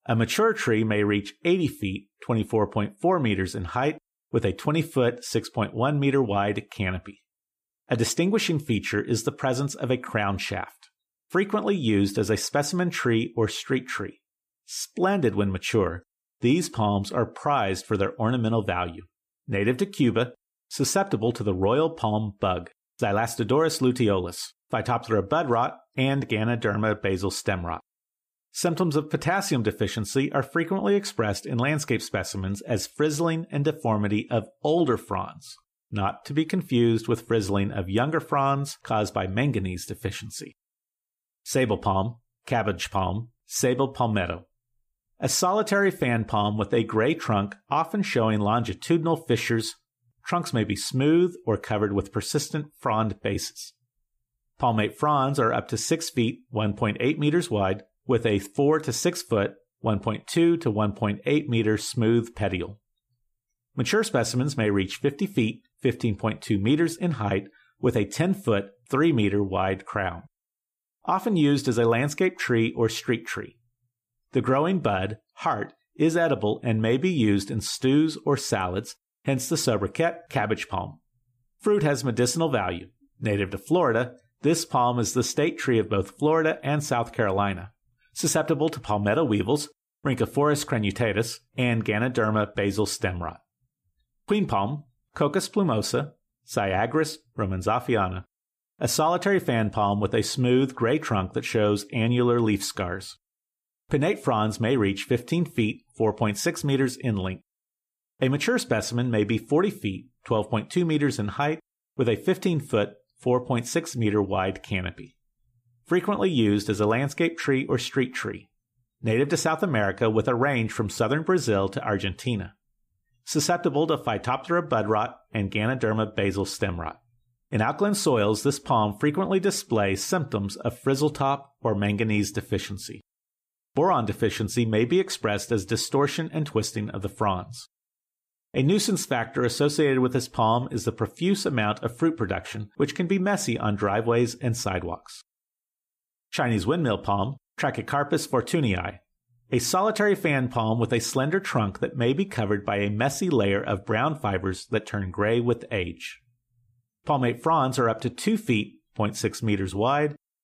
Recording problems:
none

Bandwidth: 15 kHz